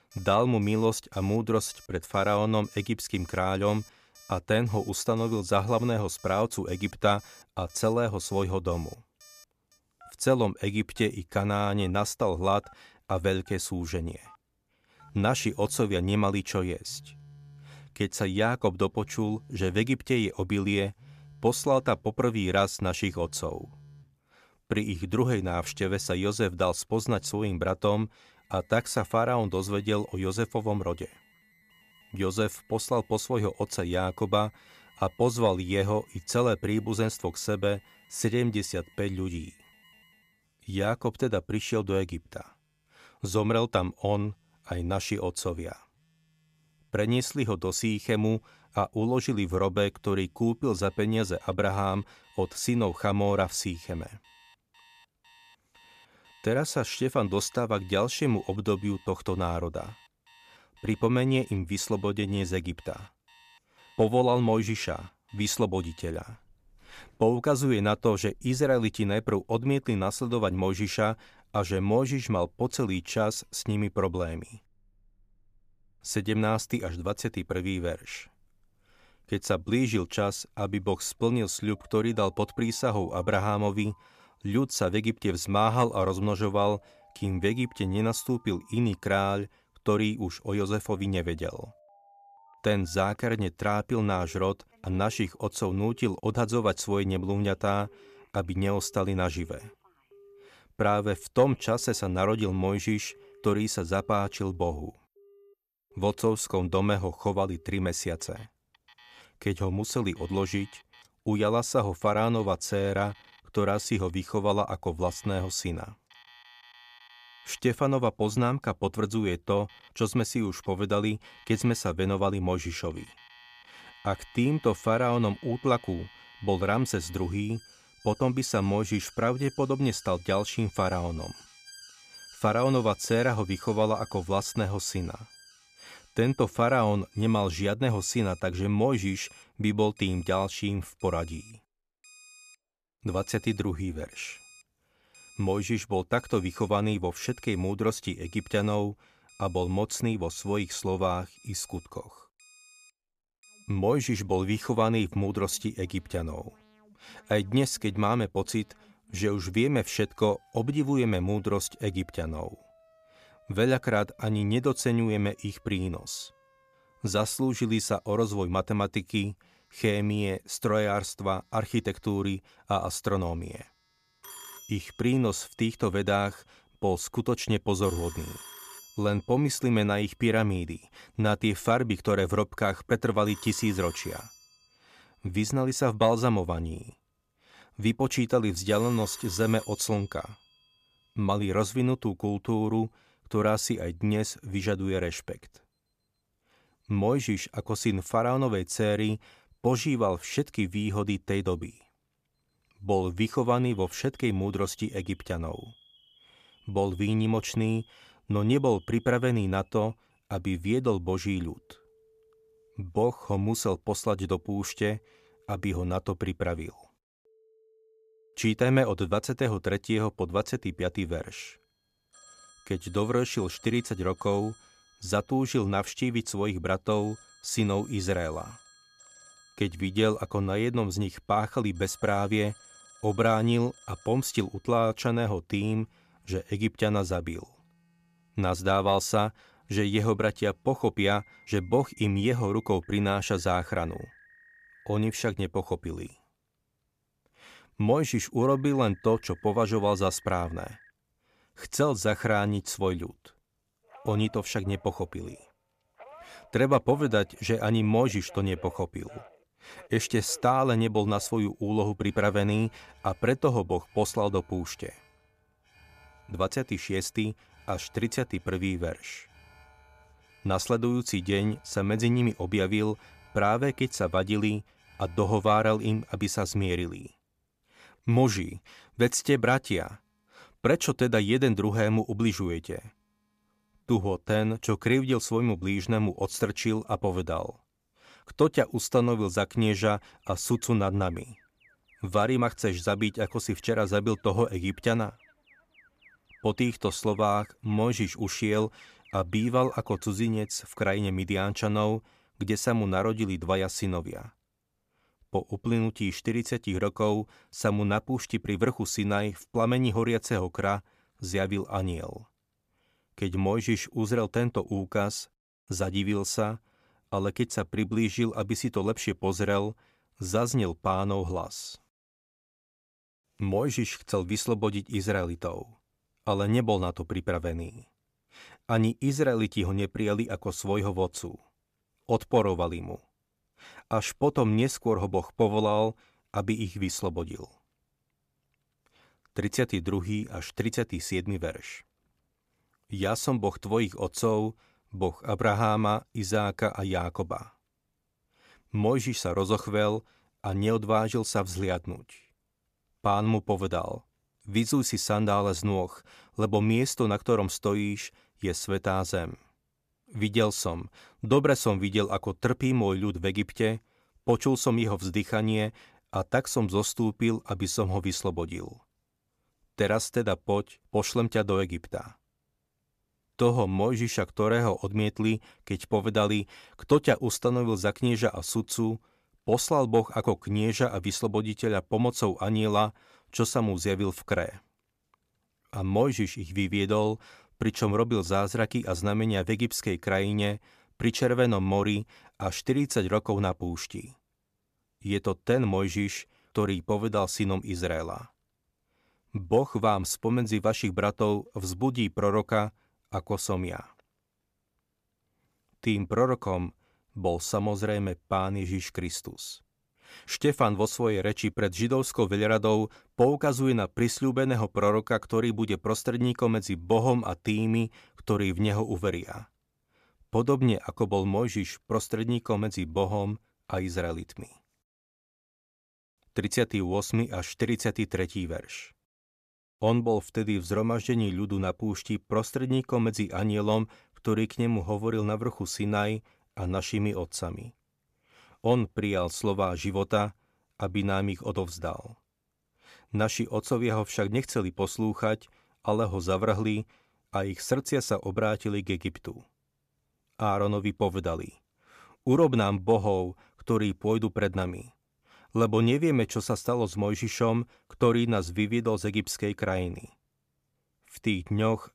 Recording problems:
alarms or sirens; faint; until 5:00; 25 dB below the speech

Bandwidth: 14.5 kHz